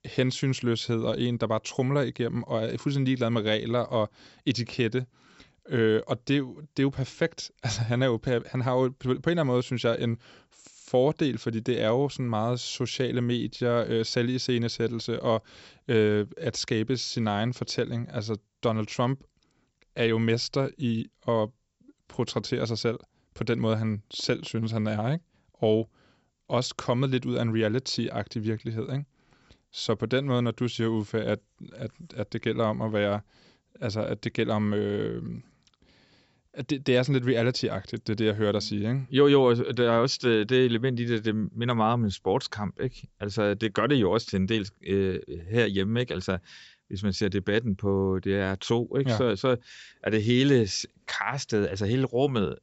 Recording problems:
high frequencies cut off; noticeable; nothing above 7.5 kHz

